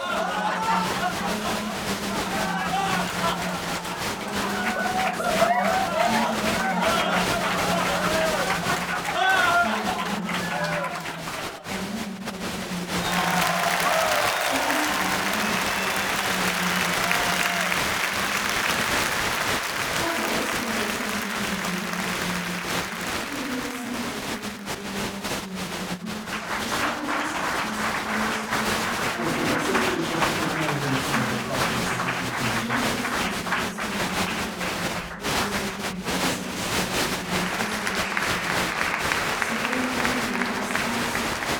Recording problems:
room echo; strong; dies away in 2.3 s
off-mic speech; far
crowd noise; very loud; throughout; 10 dB above the speech

